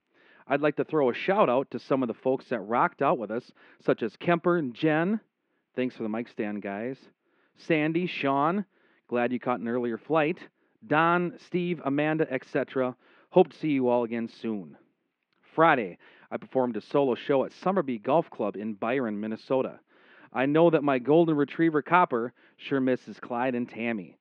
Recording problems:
muffled; very; fading above 2.5 kHz

